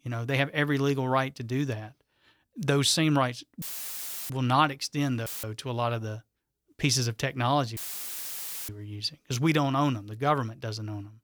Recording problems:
audio cutting out; filled with static; at 3.5 s for 0.5 s, at 5.5 s and at 8 s for 1 s

